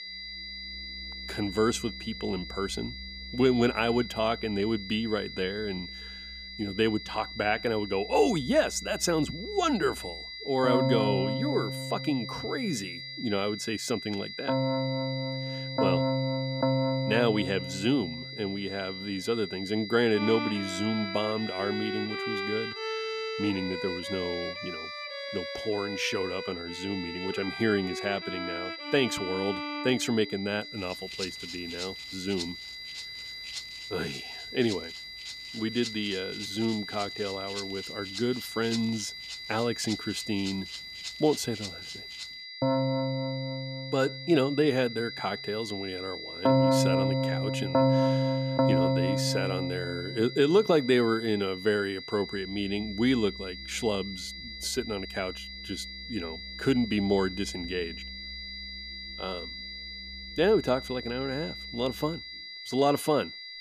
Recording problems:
high-pitched whine; loud; throughout; 2 kHz, 9 dB below the speech
background music; loud; throughout; 3 dB below the speech

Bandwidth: 14.5 kHz